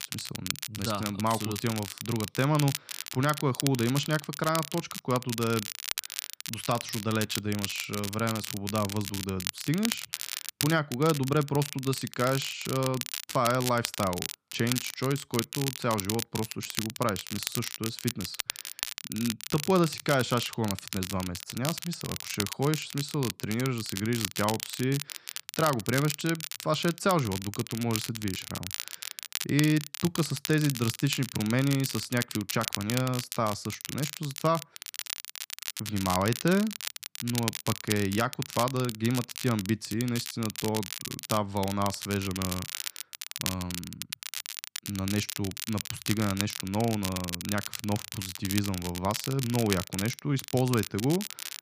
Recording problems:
crackle, like an old record; loud; 6 dB below the speech

